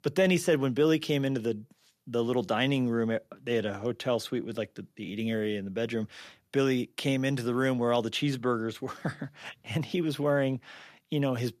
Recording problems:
none

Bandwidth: 14.5 kHz